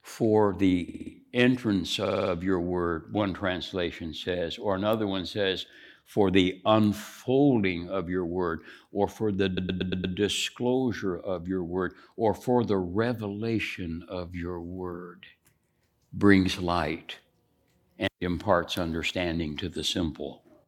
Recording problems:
audio stuttering; at 1 s, at 2 s and at 9.5 s

